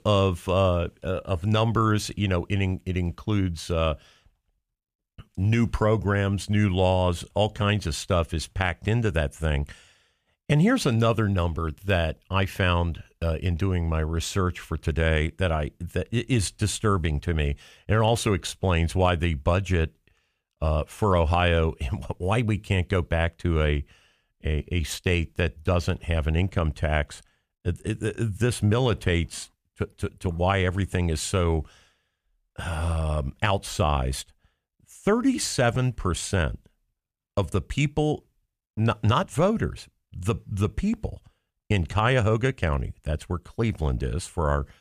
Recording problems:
none

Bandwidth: 15 kHz